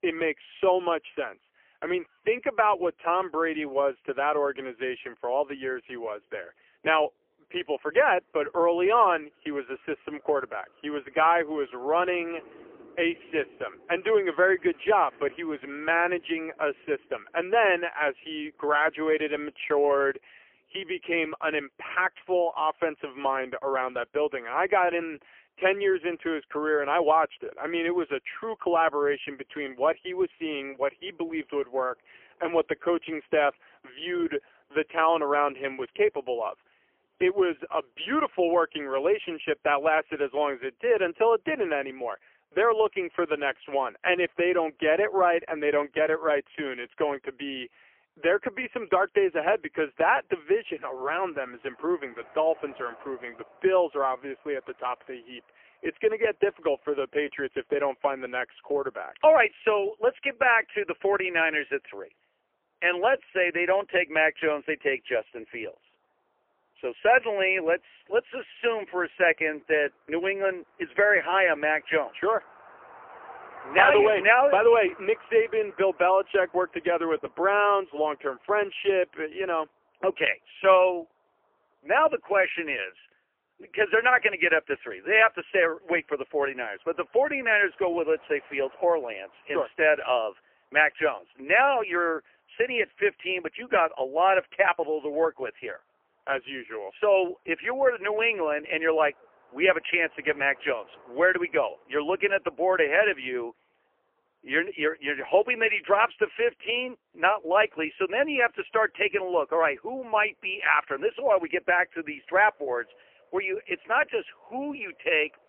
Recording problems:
phone-call audio; poor line; nothing above 3 kHz
traffic noise; faint; throughout; 25 dB below the speech

